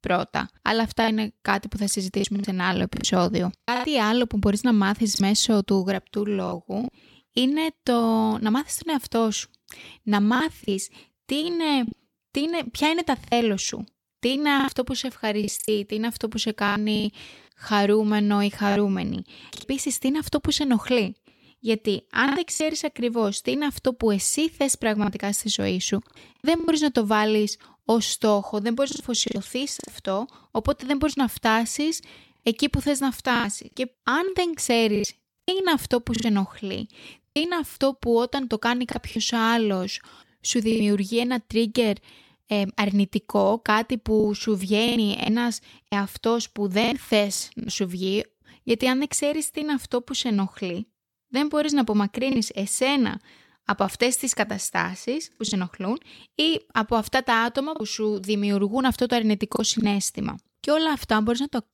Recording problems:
choppy; very; 6% of the speech affected

